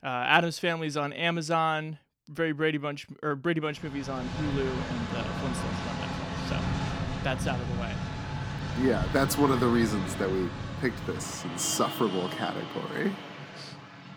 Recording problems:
traffic noise; loud; from 4 s on; 5 dB below the speech

